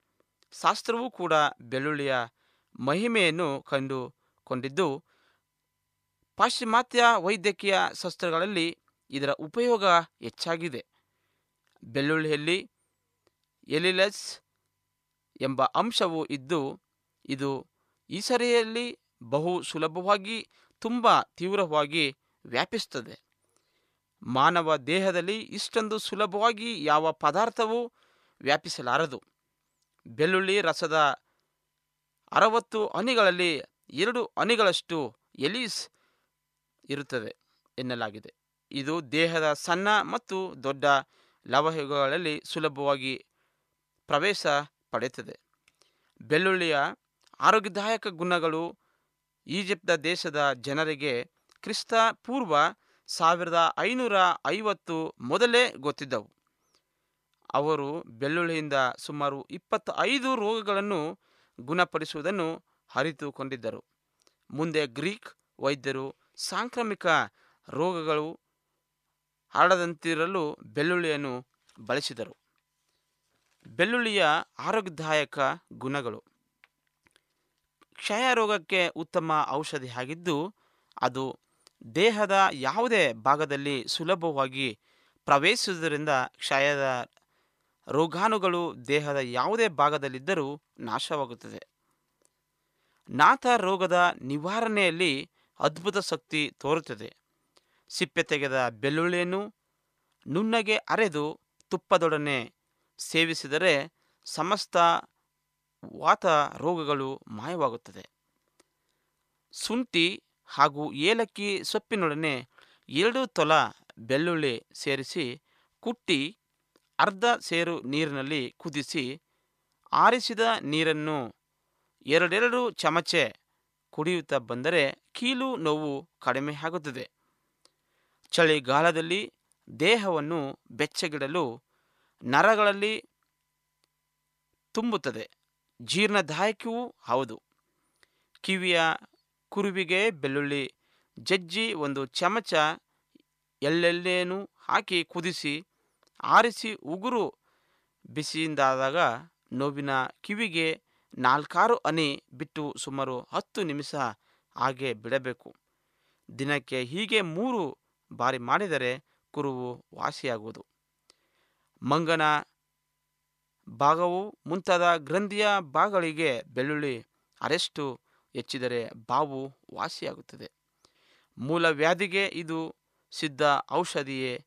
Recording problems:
none

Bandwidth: 14.5 kHz